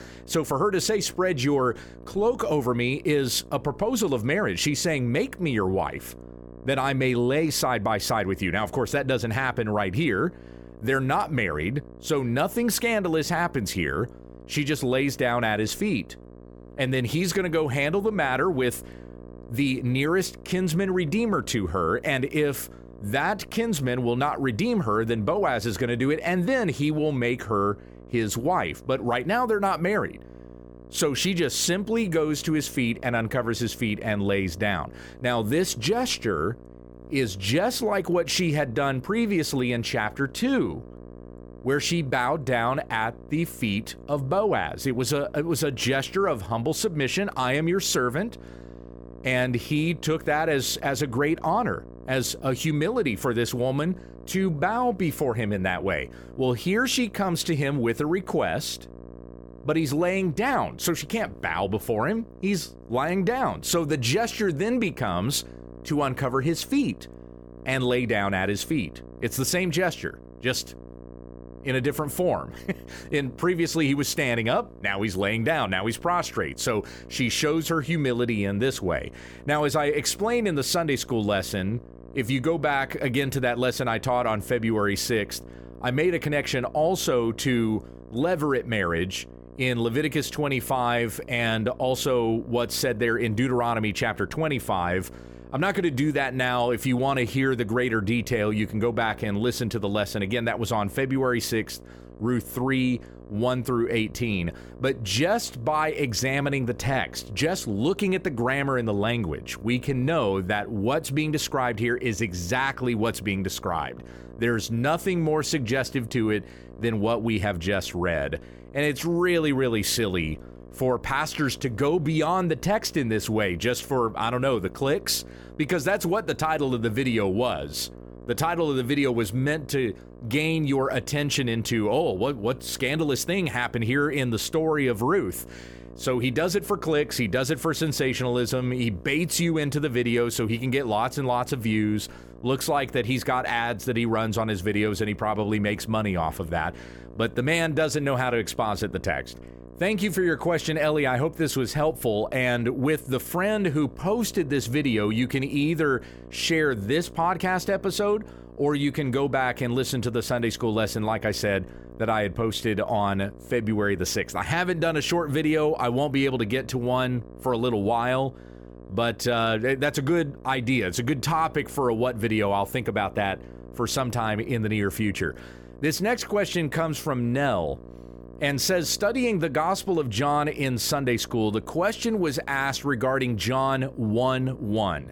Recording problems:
electrical hum; faint; throughout; 60 Hz, 25 dB below the speech

